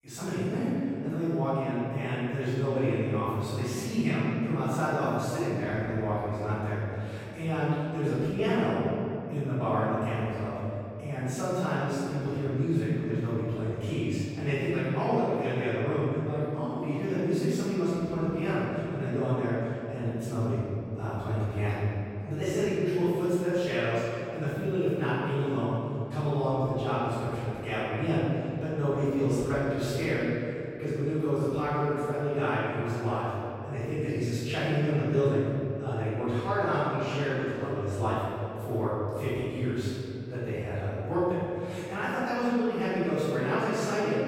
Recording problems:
room echo; strong; dies away in 2.5 s
off-mic speech; far

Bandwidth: 16.5 kHz